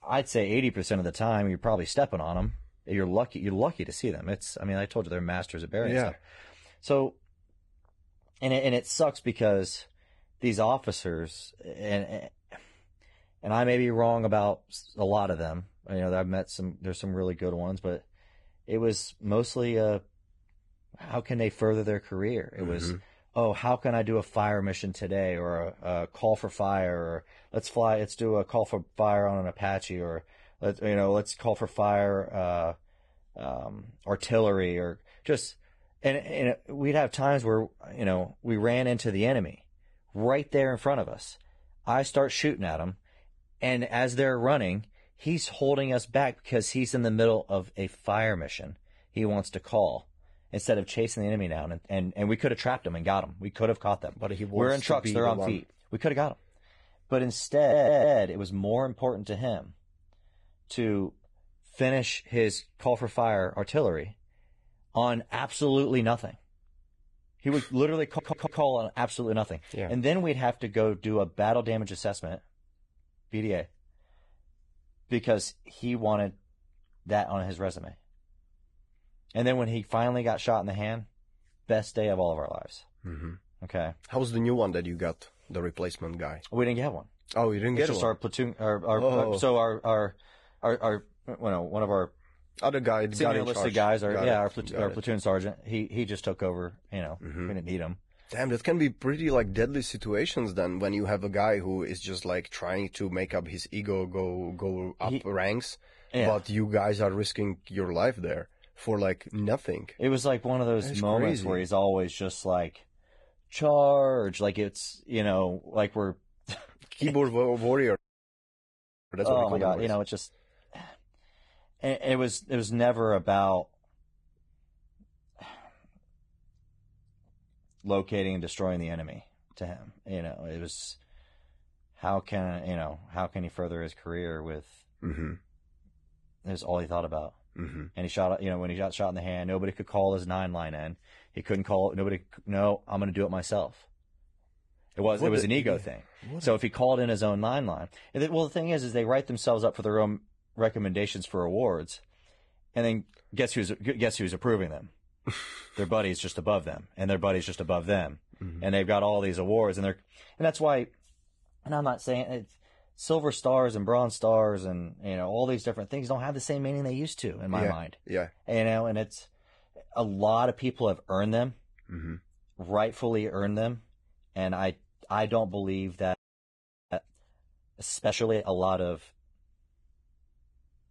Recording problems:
garbled, watery; badly
audio stuttering; at 58 s and at 1:08
audio freezing; at 1:58 for 1 s and at 2:56 for 1 s

